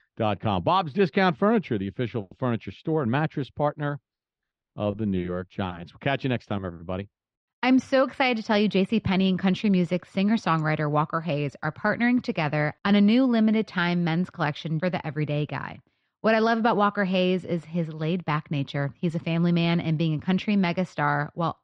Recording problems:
muffled; slightly; fading above 4 kHz

